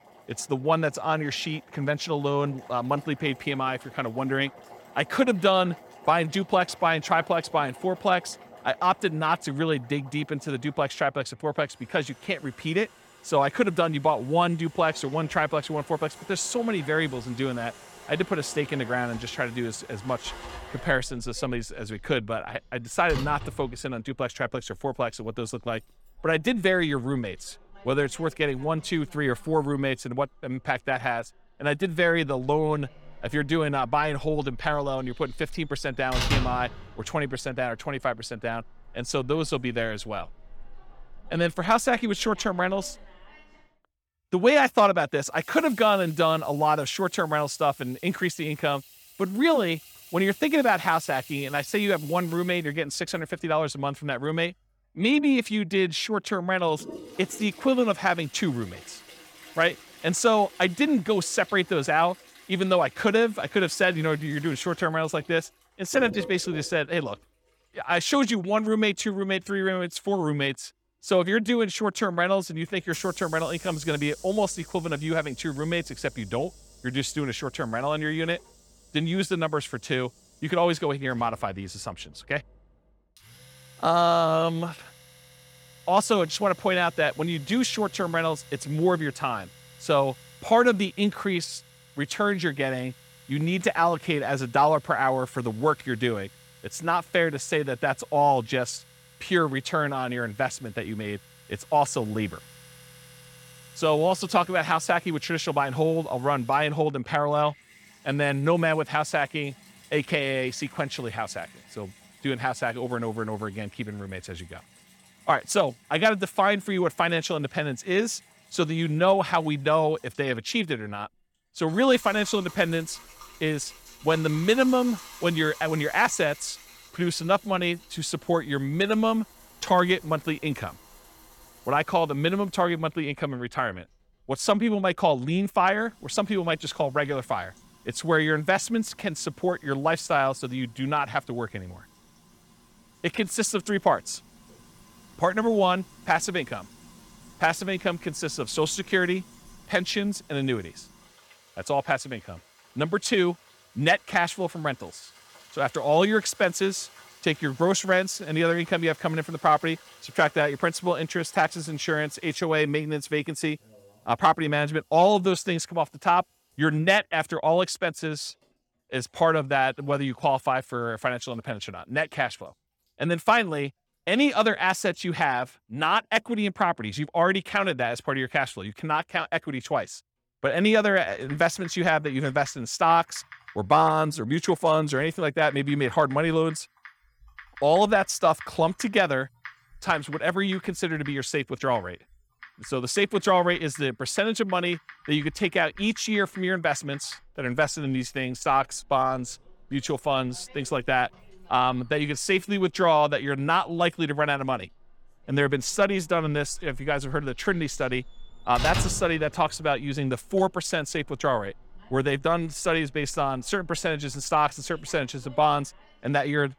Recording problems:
household noises; faint; throughout; 20 dB below the speech

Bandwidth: 18 kHz